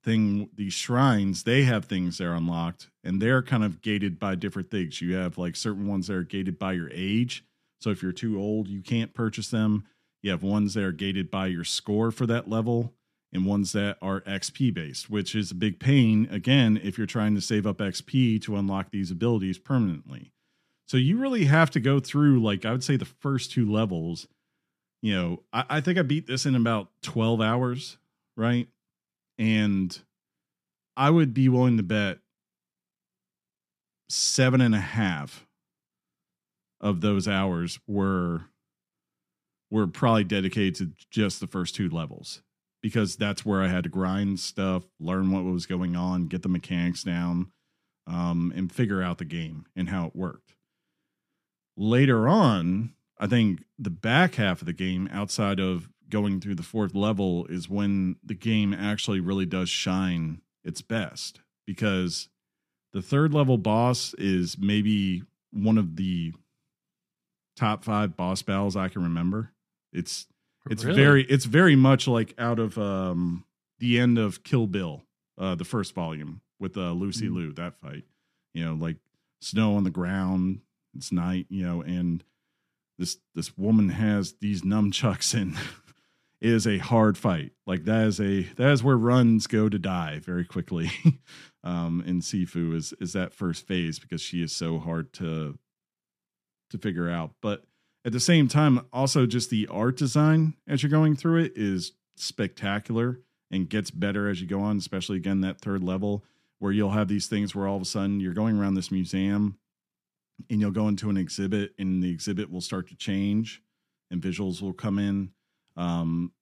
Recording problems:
none

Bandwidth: 14.5 kHz